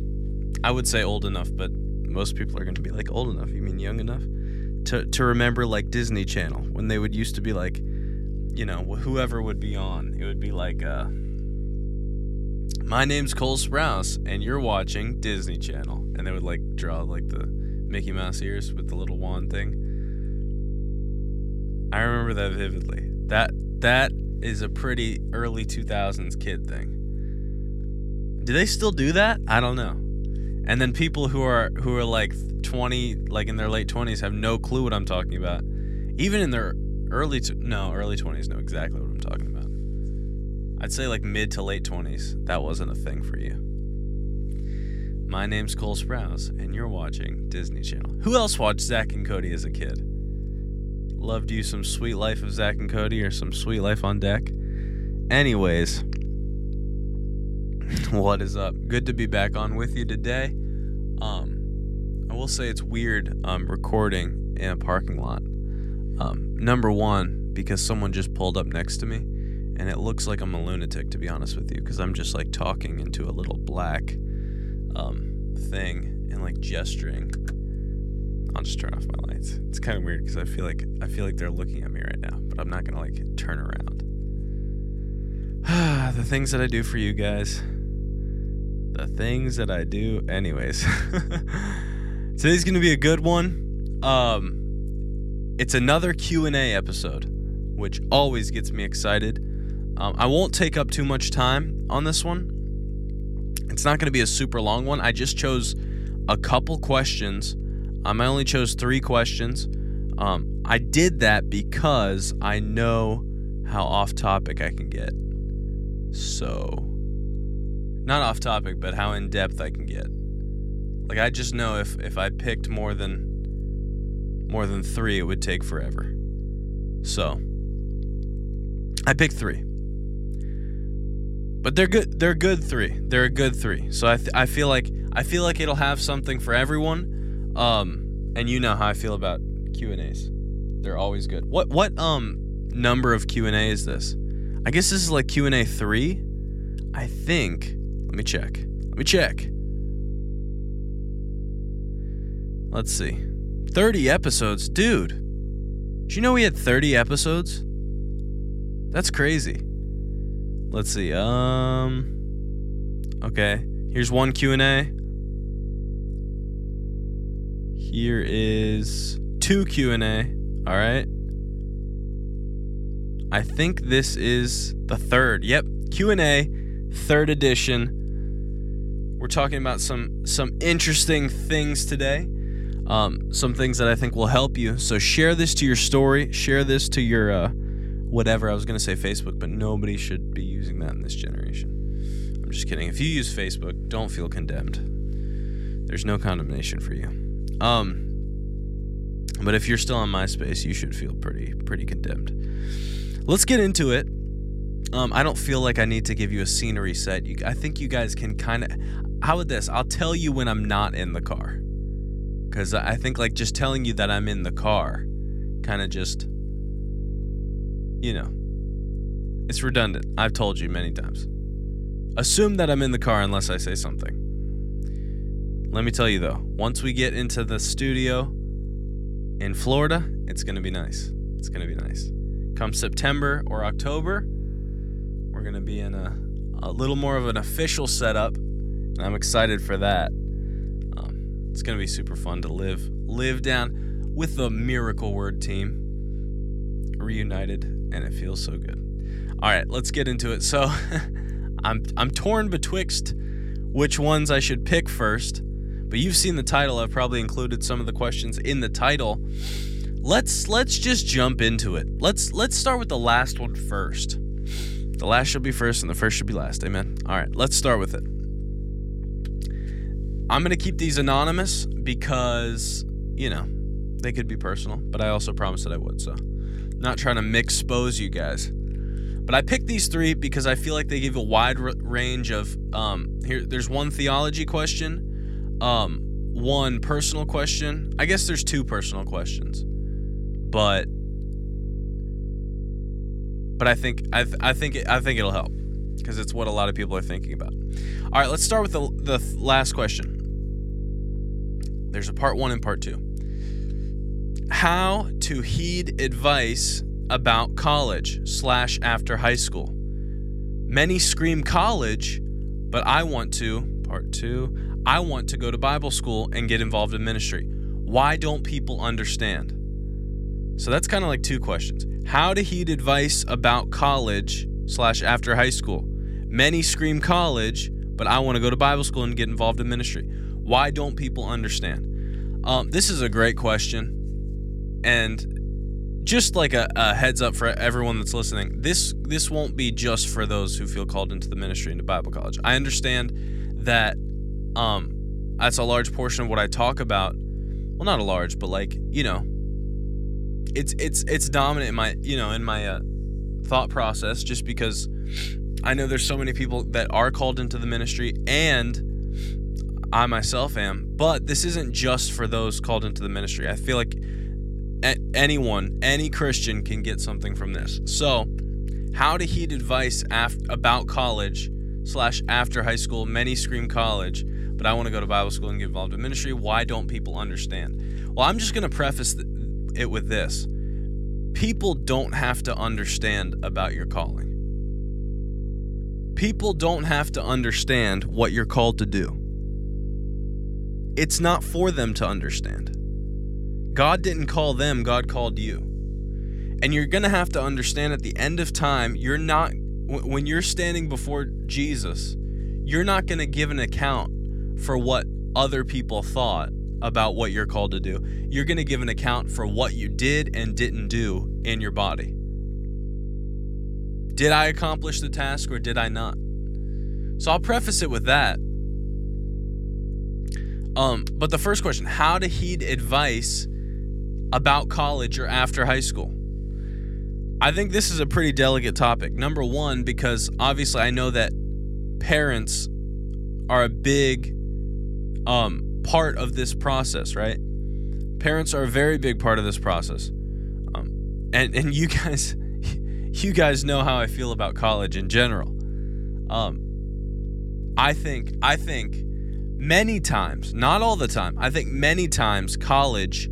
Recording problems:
electrical hum; noticeable; throughout; 50 Hz, 20 dB below the speech

